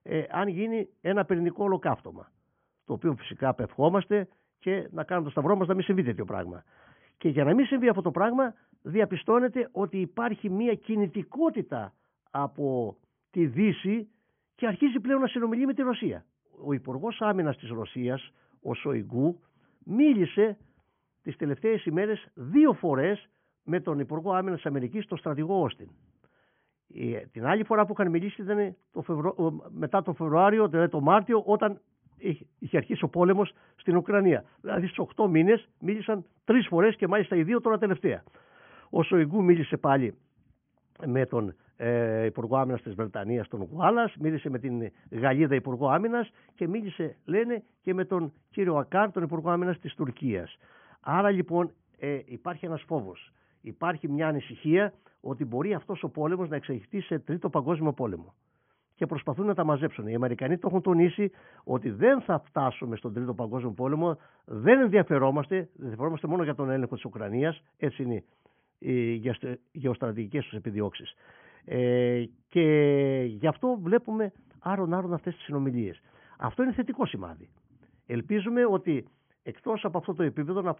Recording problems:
high frequencies cut off; severe; nothing above 3.5 kHz
muffled; very slightly; fading above 2.5 kHz

